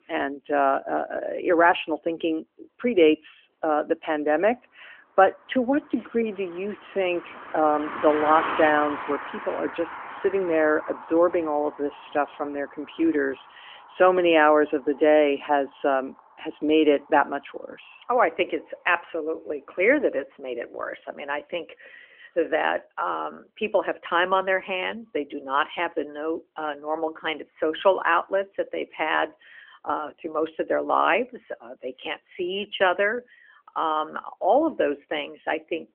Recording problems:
phone-call audio; nothing above 3 kHz
traffic noise; noticeable; throughout; 10 dB below the speech

